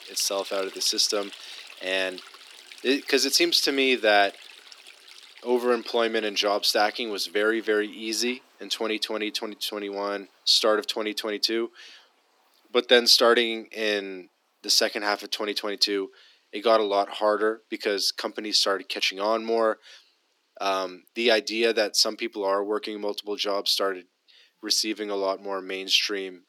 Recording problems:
thin; somewhat; fading below 250 Hz
rain or running water; faint; throughout; 20 dB below the speech

